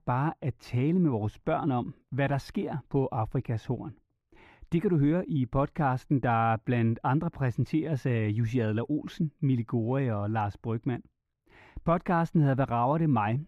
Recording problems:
muffled; very; fading above 4 kHz

